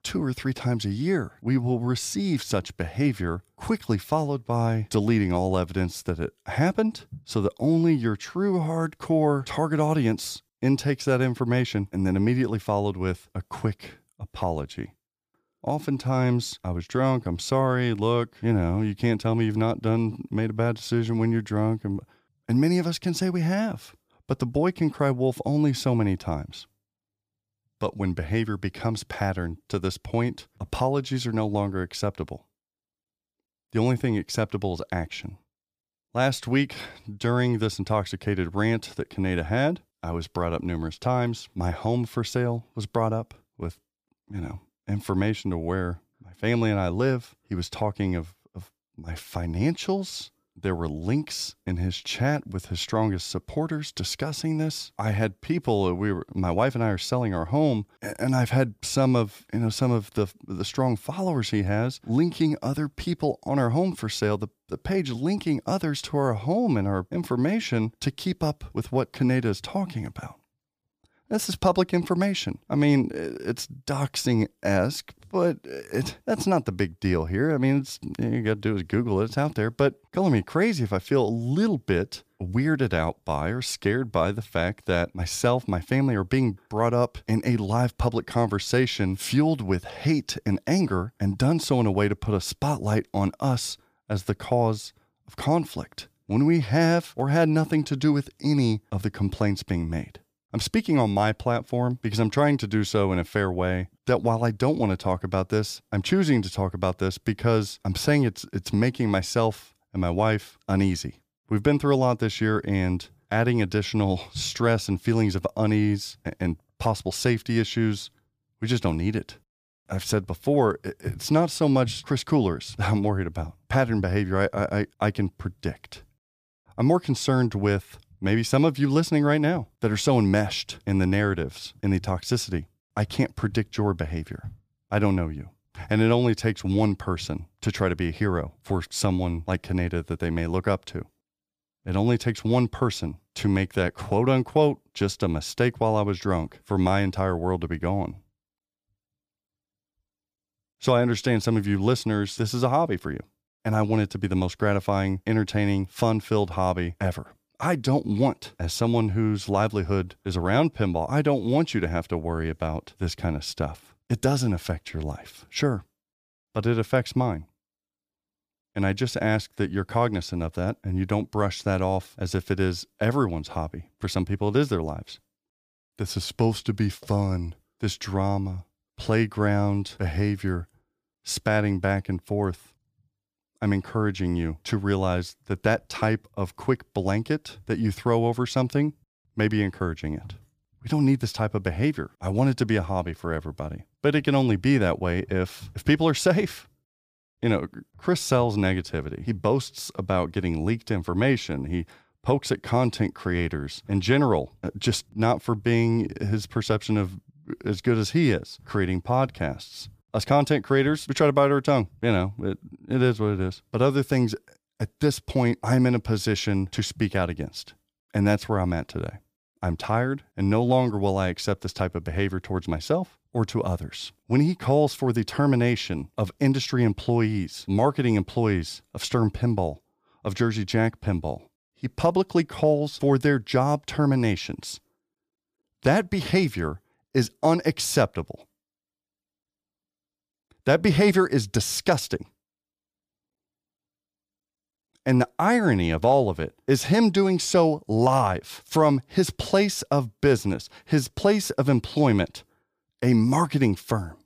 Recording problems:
none

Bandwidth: 15 kHz